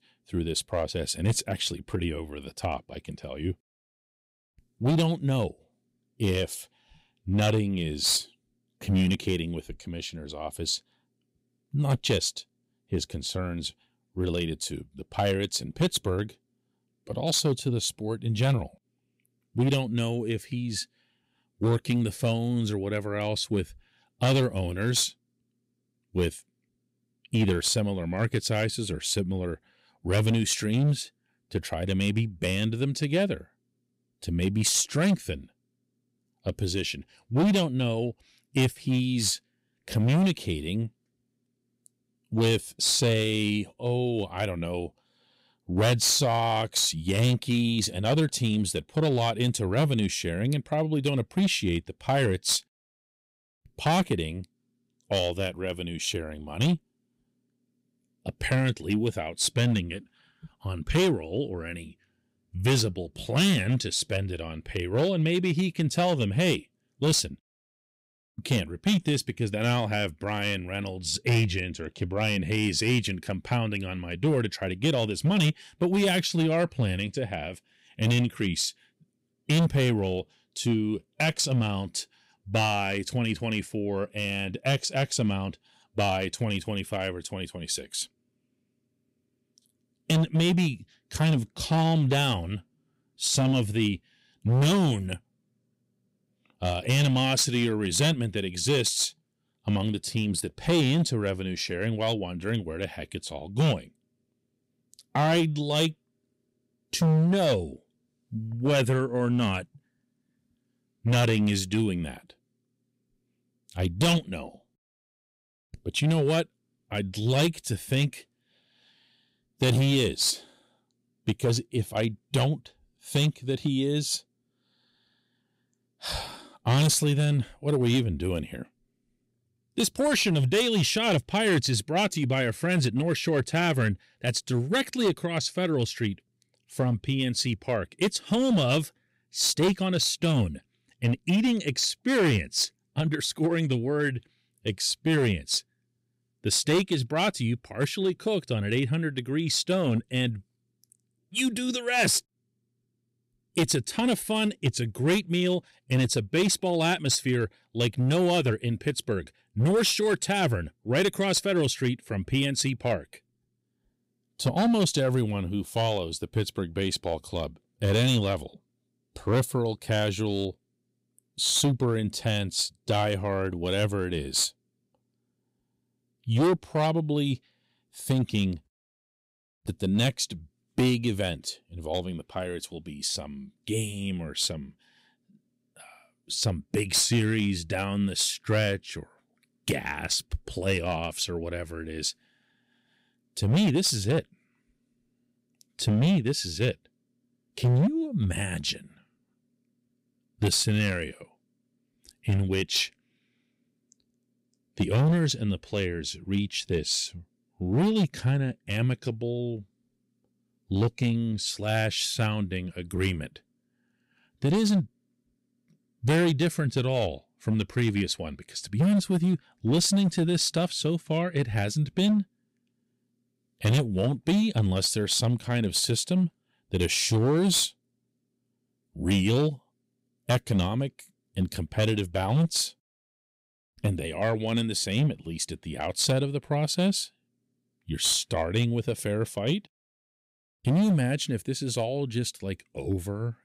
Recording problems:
distortion; slight; 5% of the sound clipped

